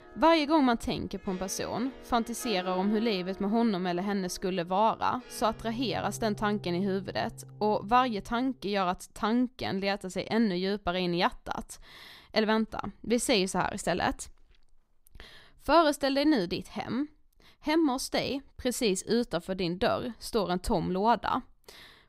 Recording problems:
background music; noticeable; until 8.5 s; 20 dB below the speech

